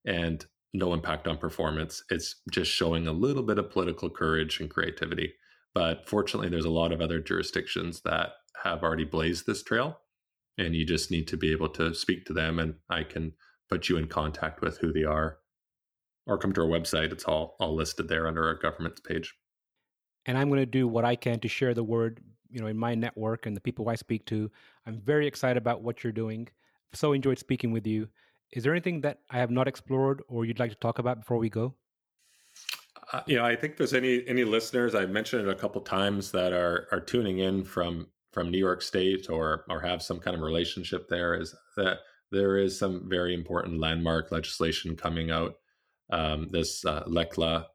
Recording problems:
none

